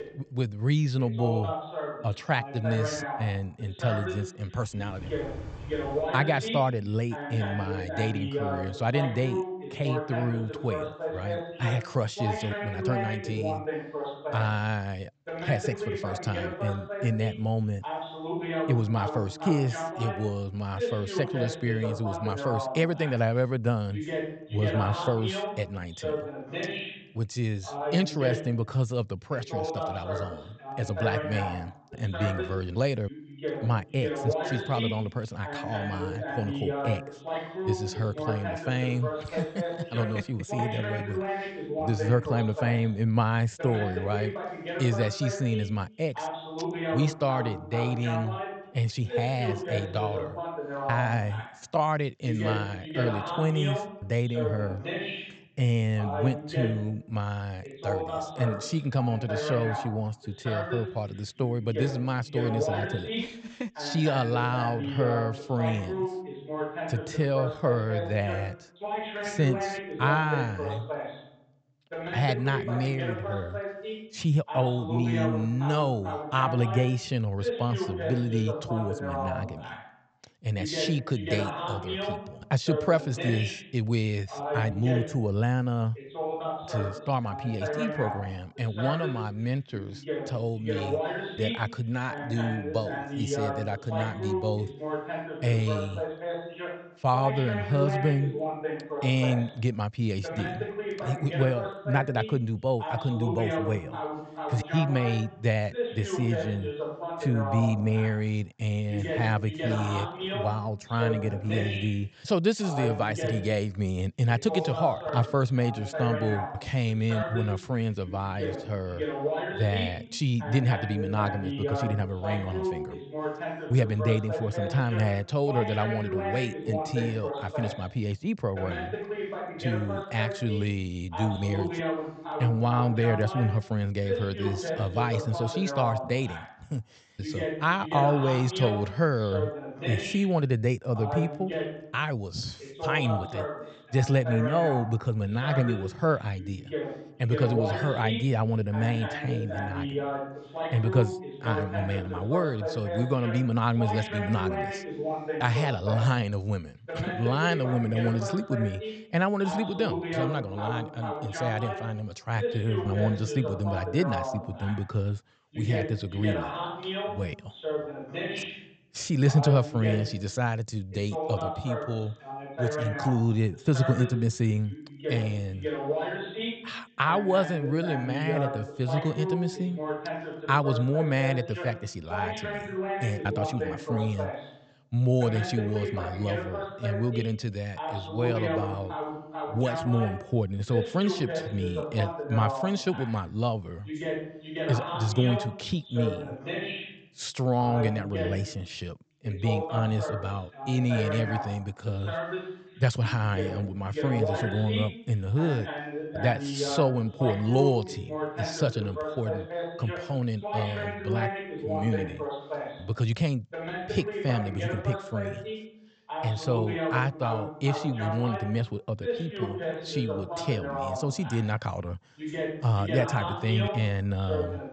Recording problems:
high frequencies cut off; noticeable; nothing above 8 kHz
voice in the background; loud; throughout; 5 dB below the speech

